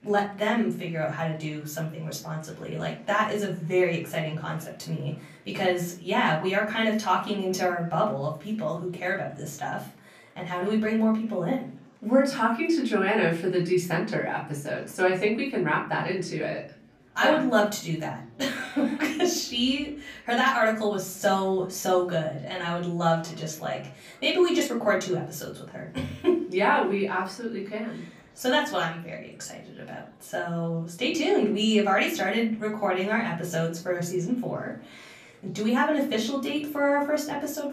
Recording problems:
off-mic speech; far
room echo; slight; dies away in 0.4 s
murmuring crowd; faint; throughout; 30 dB below the speech

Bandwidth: 15 kHz